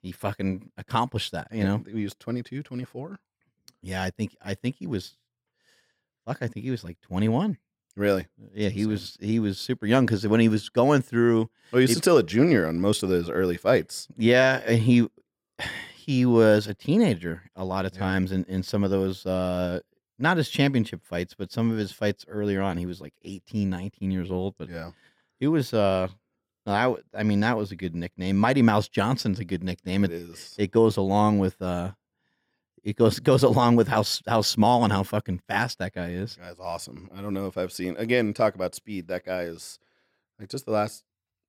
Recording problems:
none

